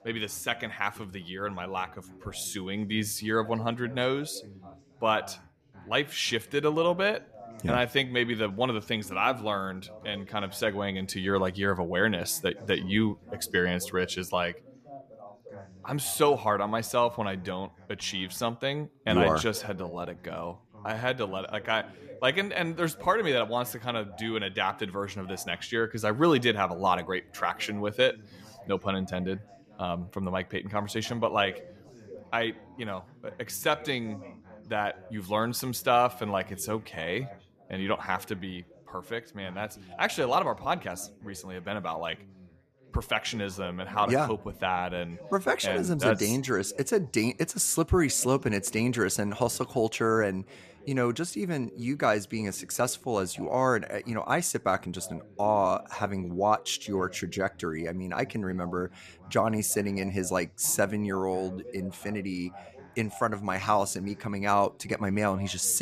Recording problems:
background chatter; faint; throughout; 4 voices, 20 dB below the speech
abrupt cut into speech; at the end

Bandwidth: 14.5 kHz